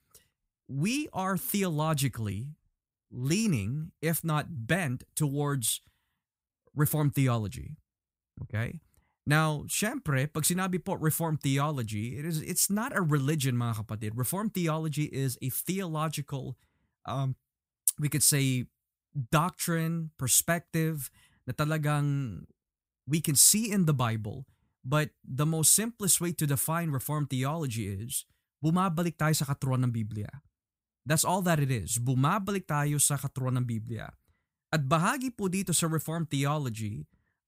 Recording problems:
none

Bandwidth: 15.5 kHz